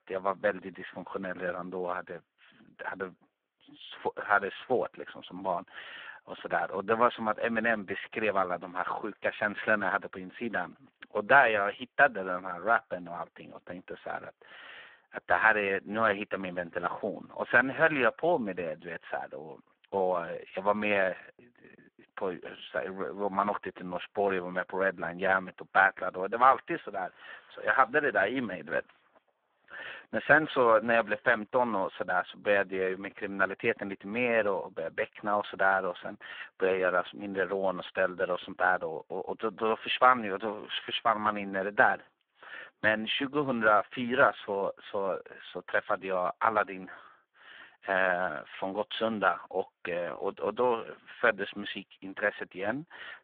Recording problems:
phone-call audio; poor line

